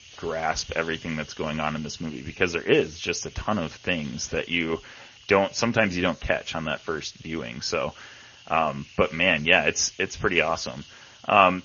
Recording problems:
garbled, watery; slightly; nothing above 6.5 kHz
hiss; faint; throughout; 20 dB below the speech

